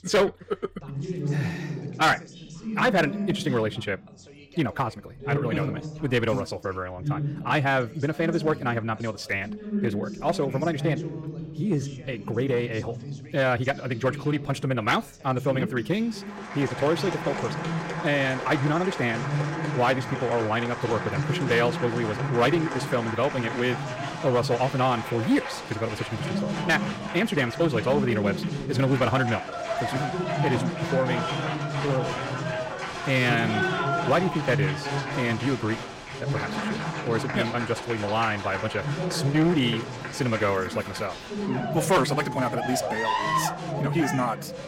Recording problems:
wrong speed, natural pitch; too fast; 1.5 times normal speed
distortion; slight; 3% of the sound clipped
crowd noise; loud; from 16 s on; 6 dB below the speech
background chatter; loud; throughout; 2 voices, 7 dB below the speech

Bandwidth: 16 kHz